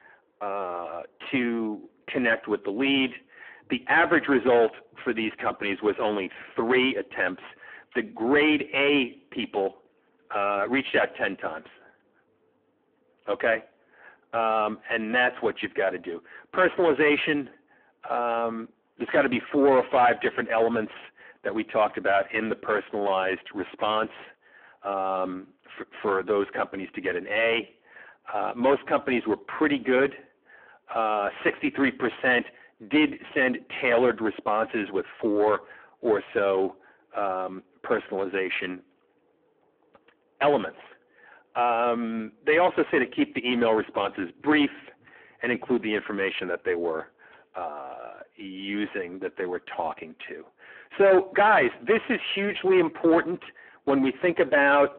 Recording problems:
phone-call audio; poor line
distortion; heavy; 6 dB below the speech

